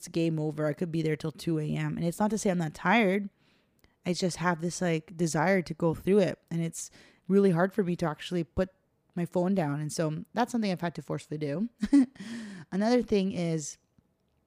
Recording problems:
none

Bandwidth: 15 kHz